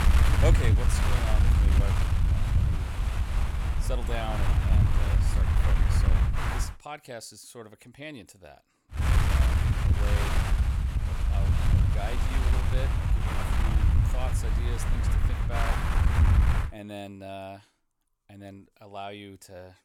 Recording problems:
wind noise on the microphone; heavy; until 6.5 s and from 9 to 17 s; 4 dB above the speech

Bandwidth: 17.5 kHz